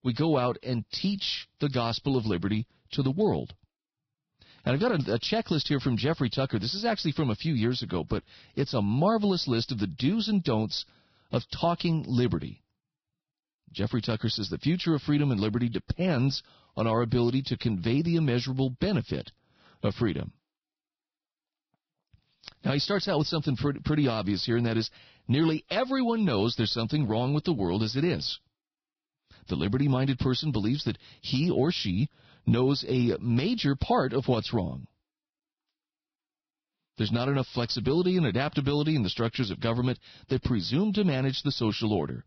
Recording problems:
garbled, watery; badly; nothing above 5.5 kHz

